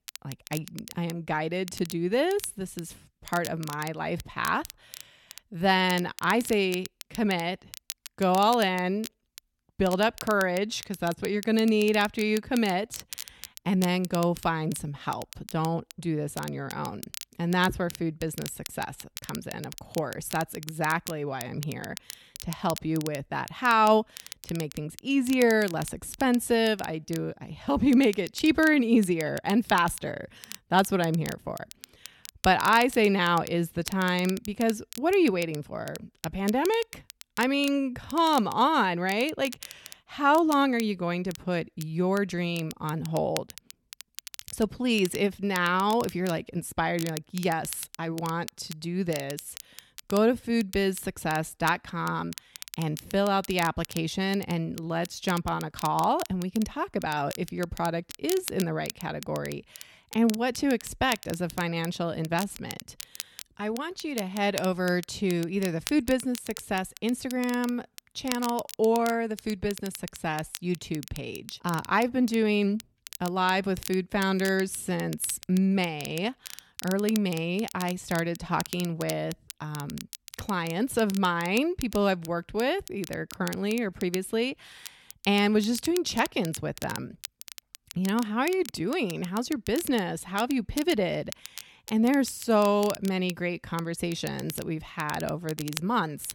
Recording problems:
crackle, like an old record; noticeable; 15 dB below the speech

